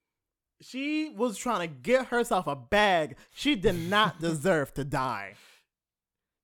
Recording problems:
none

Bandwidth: 19 kHz